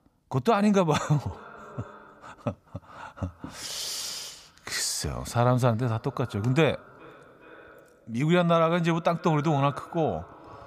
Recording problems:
echo of what is said; faint; throughout; 410 ms later, 20 dB below the speech

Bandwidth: 15 kHz